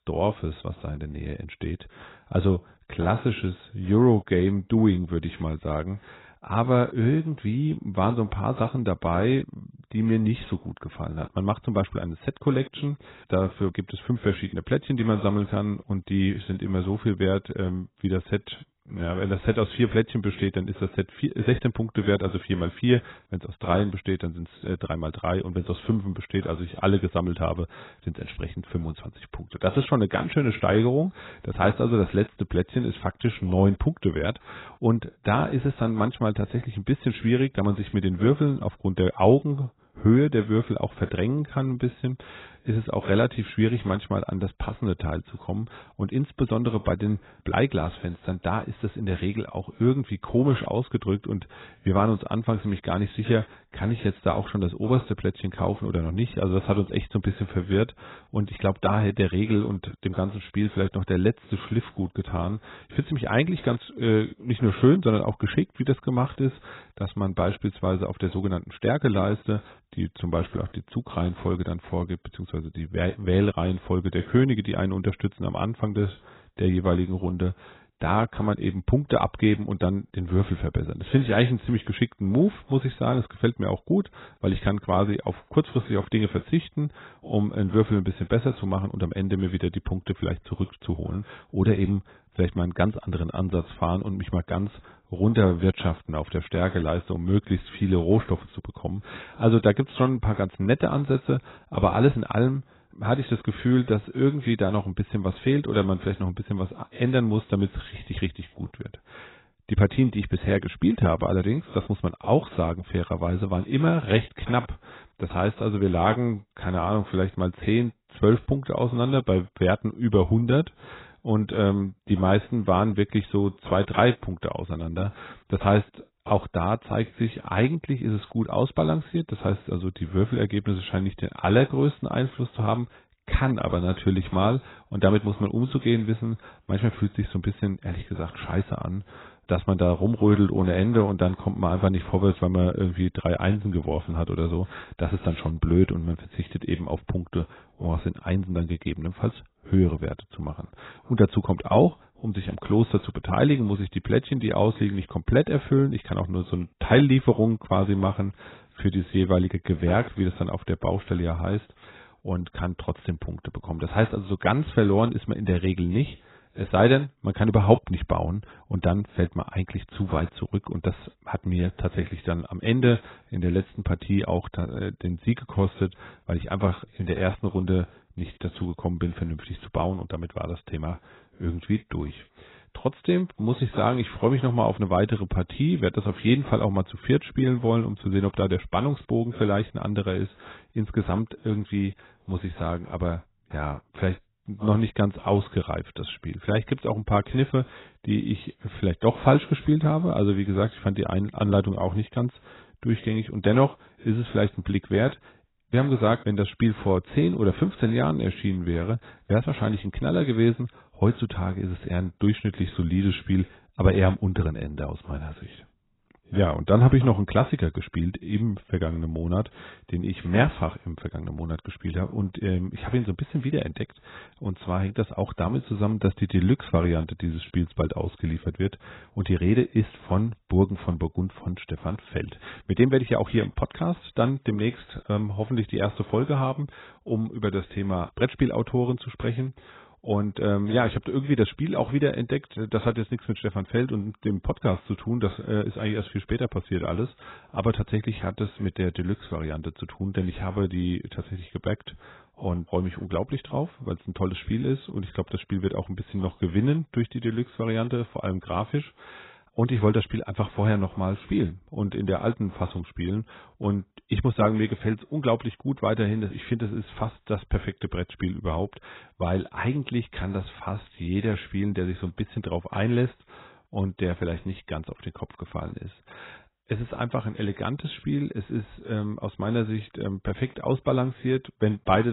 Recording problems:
garbled, watery; badly; nothing above 4 kHz
abrupt cut into speech; at the end

